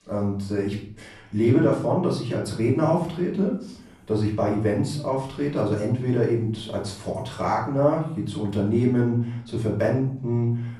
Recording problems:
off-mic speech; far
room echo; slight; dies away in 0.6 s

